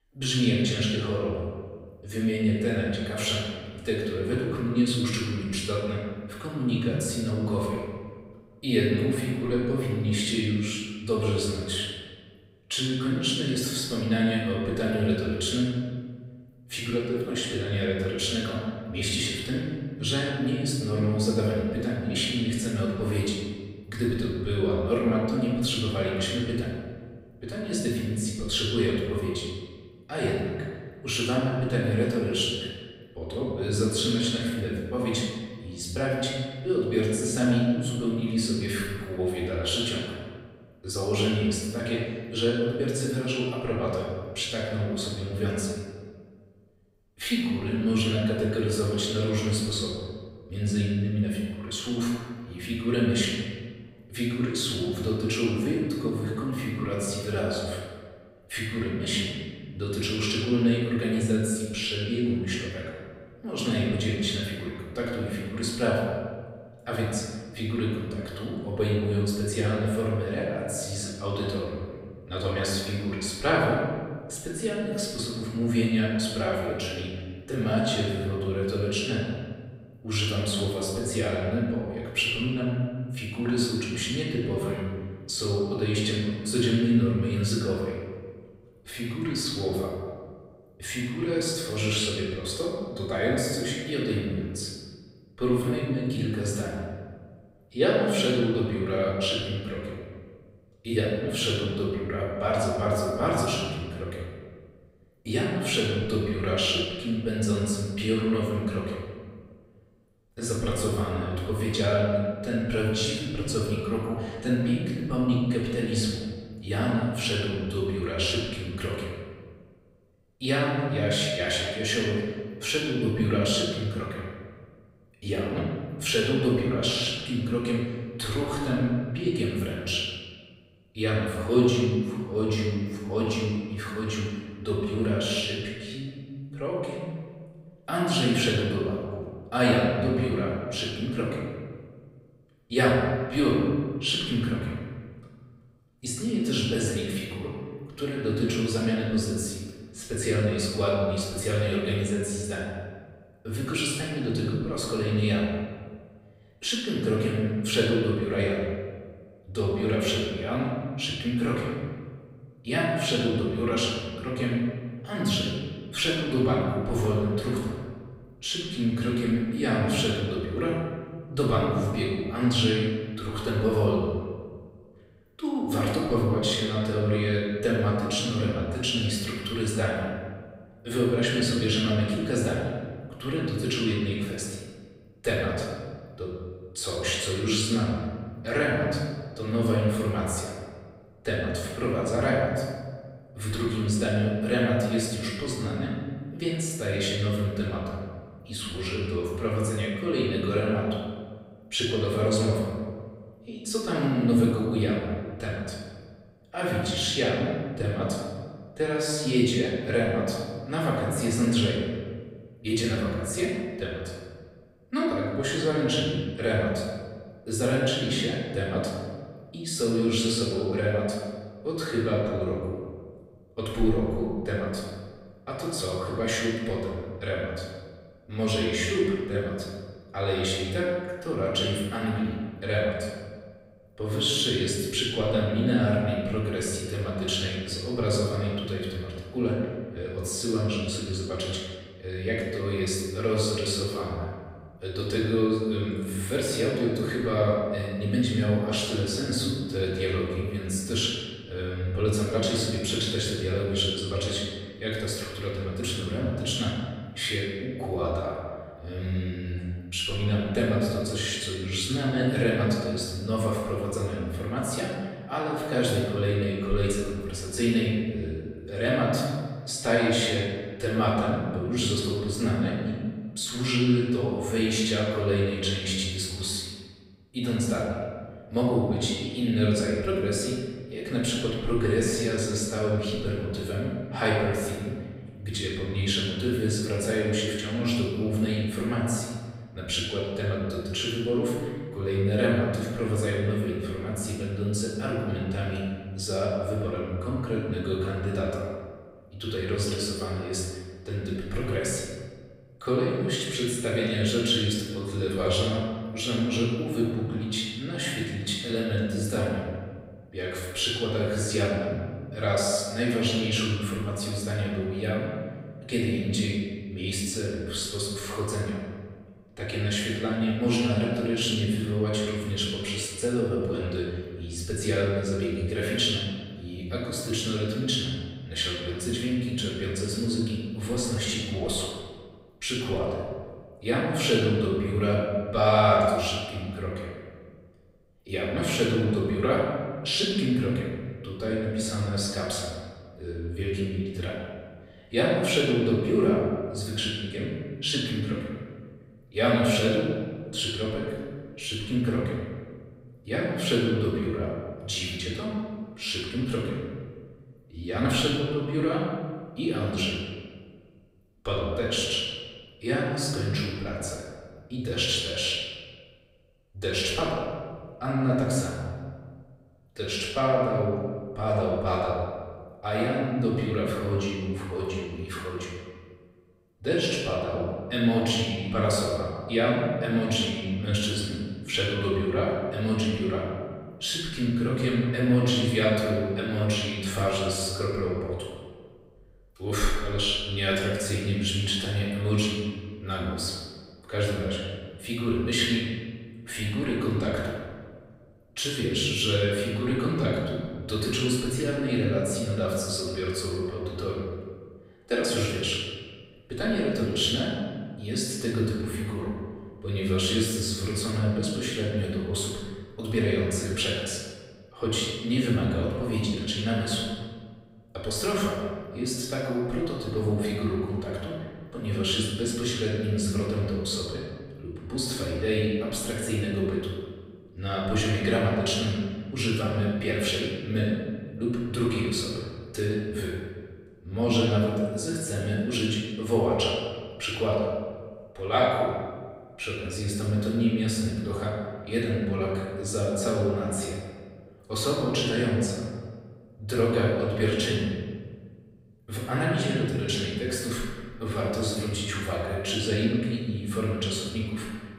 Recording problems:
off-mic speech; far
room echo; noticeable; dies away in 1.5 s

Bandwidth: 15.5 kHz